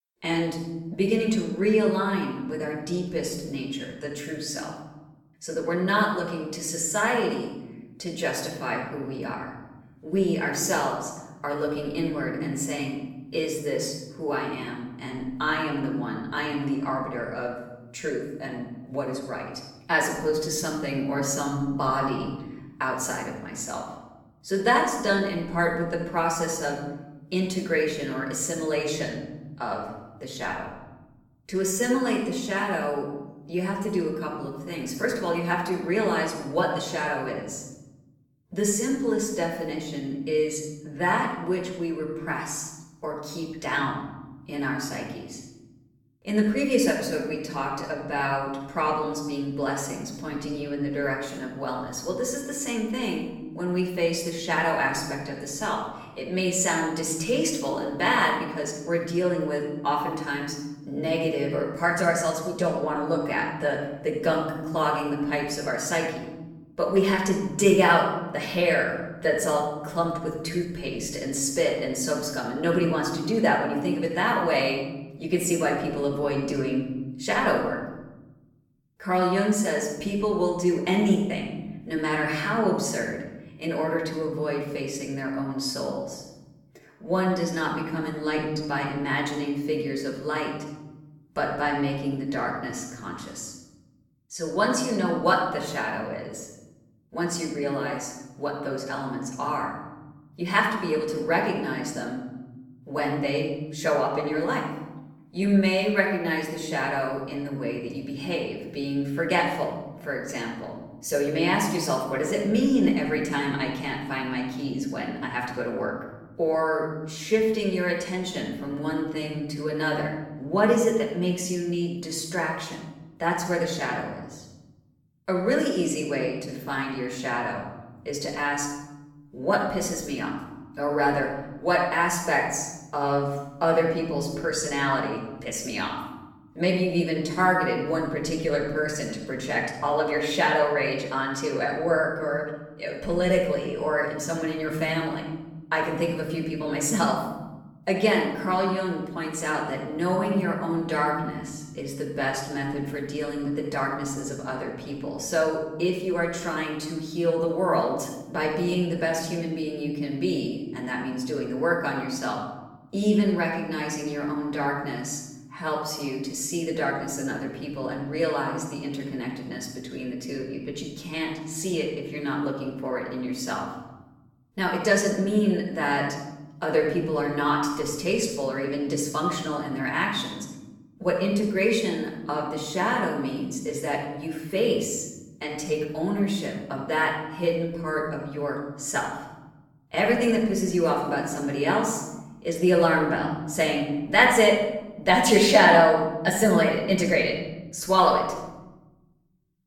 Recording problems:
off-mic speech; far
room echo; noticeable; dies away in 1.3 s

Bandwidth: 17 kHz